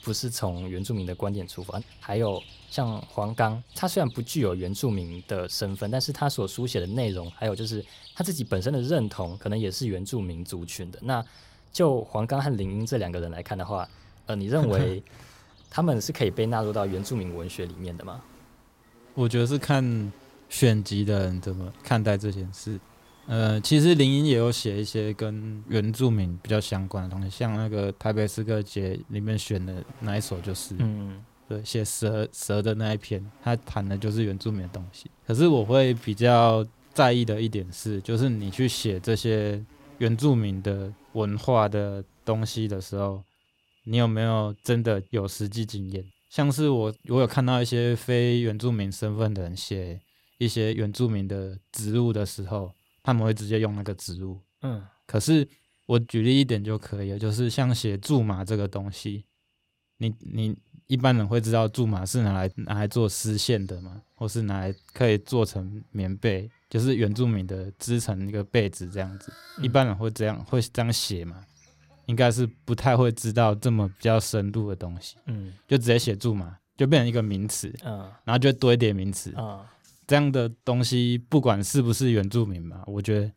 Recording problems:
animal sounds; faint; throughout; 25 dB below the speech

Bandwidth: 16 kHz